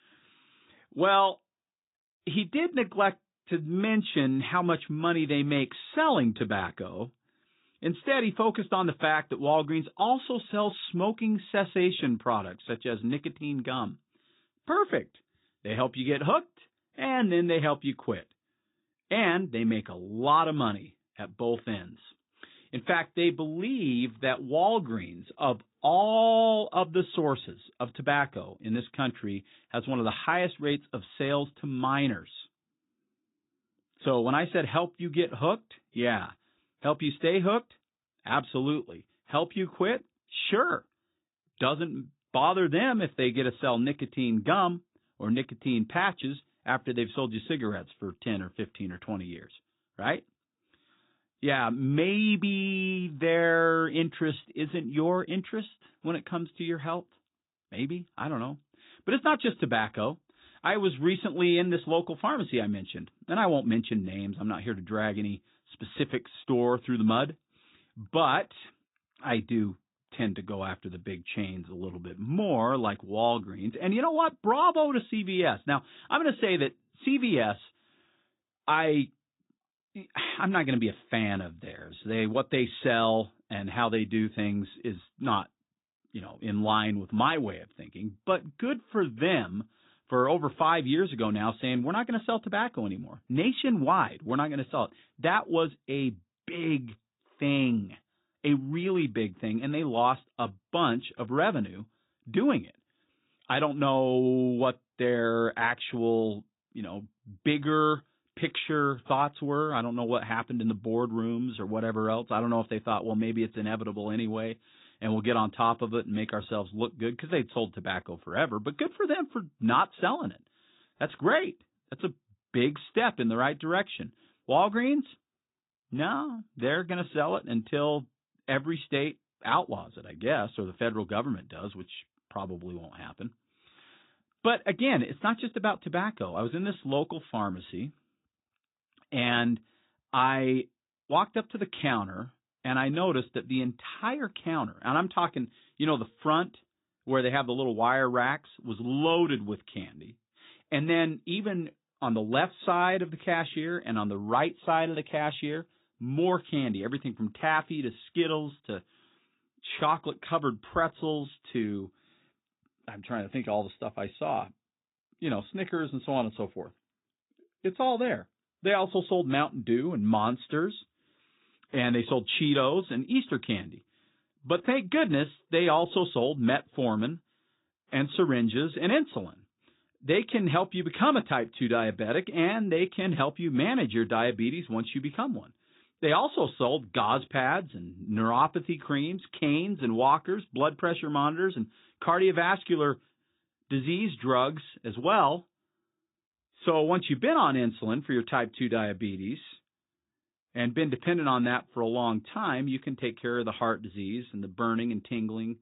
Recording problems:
high frequencies cut off; severe; nothing above 4 kHz
garbled, watery; slightly

